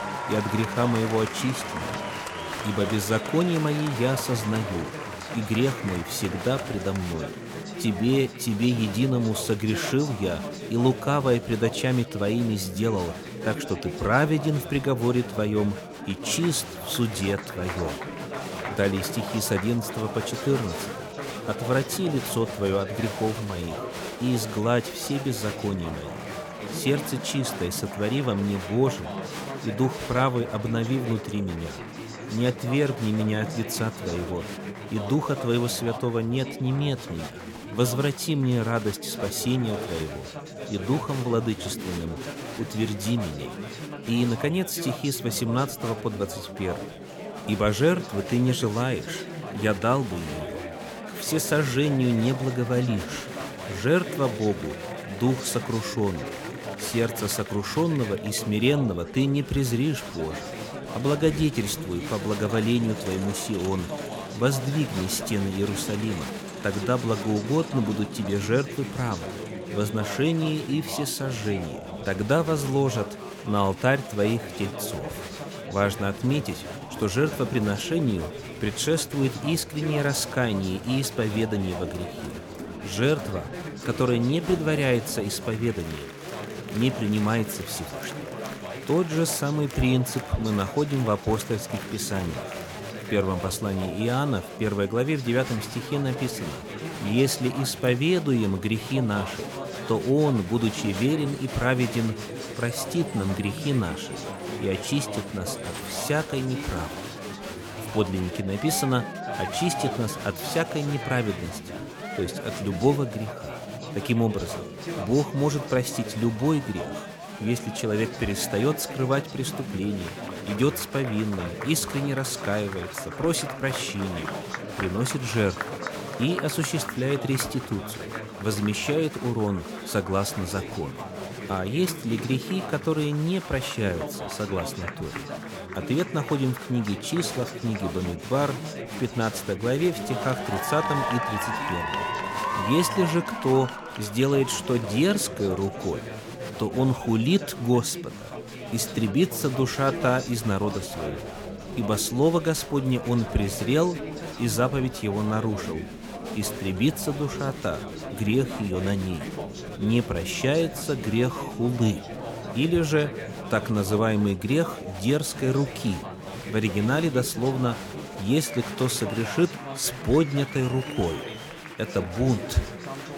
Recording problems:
chatter from many people; loud; throughout; 8 dB below the speech

